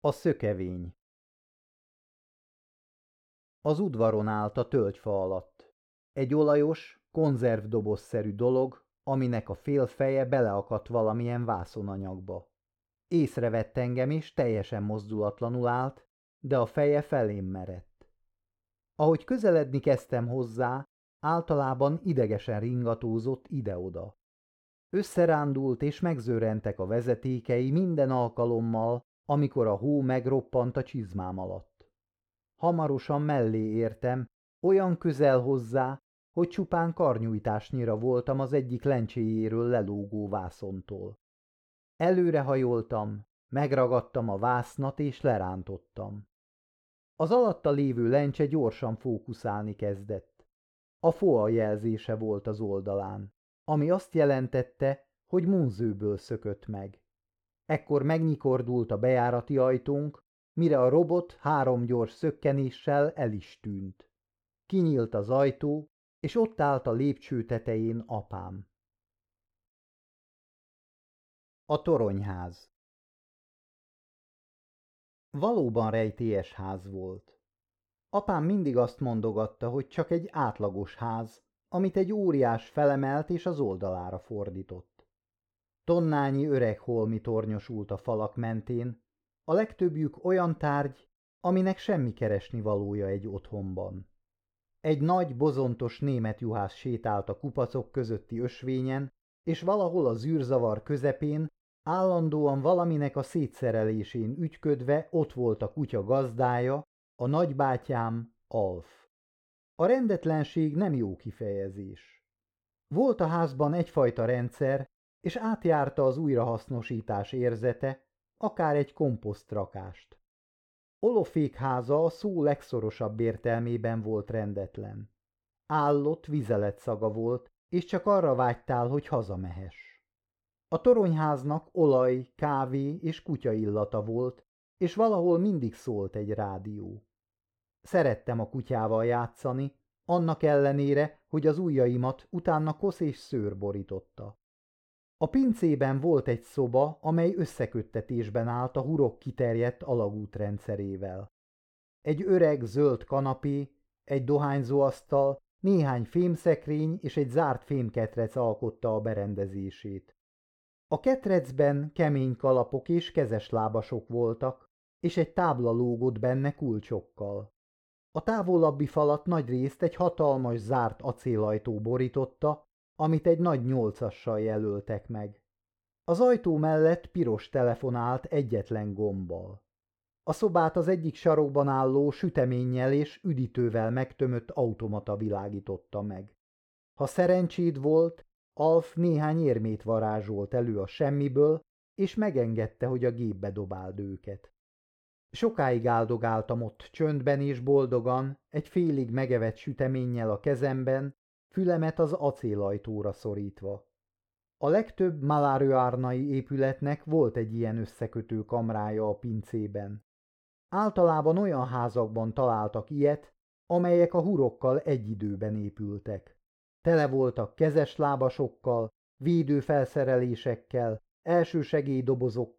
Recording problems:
muffled; slightly; fading above 3.5 kHz

